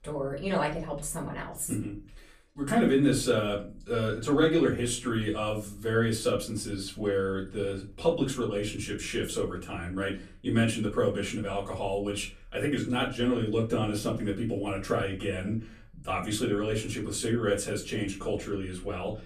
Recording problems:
off-mic speech; far
room echo; very slight; dies away in 0.3 s

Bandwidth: 14.5 kHz